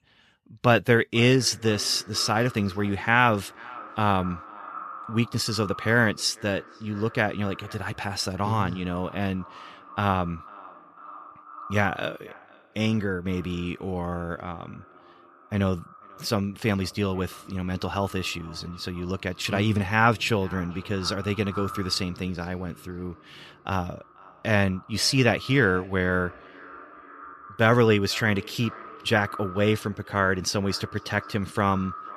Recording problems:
echo of what is said; noticeable; throughout; 490 ms later, 20 dB below the speech

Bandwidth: 14.5 kHz